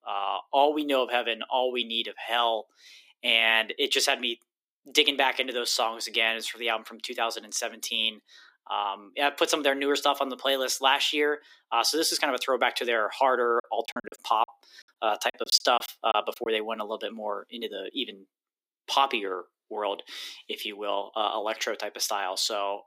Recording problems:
thin; somewhat; fading below 300 Hz
choppy; very; from 14 to 16 s; 20% of the speech affected

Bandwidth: 15.5 kHz